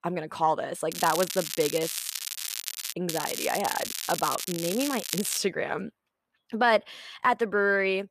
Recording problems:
crackling; loud; from 1 to 3 s and from 3 to 5.5 s; 5 dB below the speech

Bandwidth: 14.5 kHz